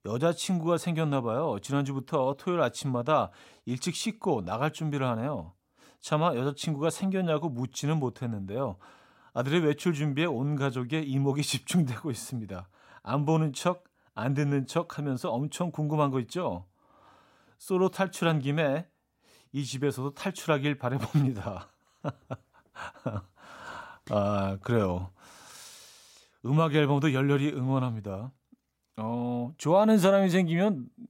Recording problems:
none

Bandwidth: 16 kHz